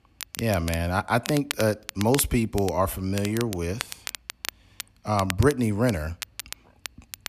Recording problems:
crackle, like an old record; noticeable; 10 dB below the speech

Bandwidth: 14.5 kHz